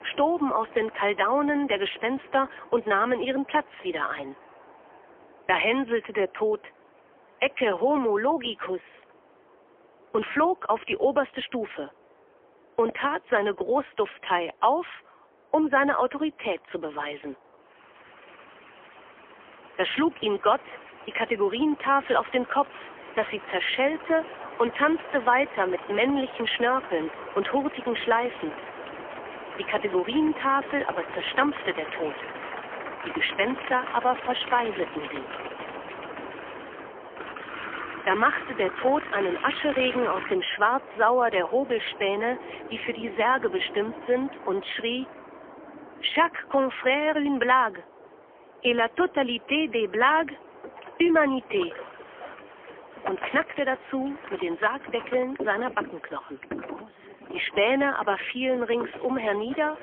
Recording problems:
phone-call audio; poor line; nothing above 3.5 kHz
train or aircraft noise; noticeable; throughout; 15 dB below the speech

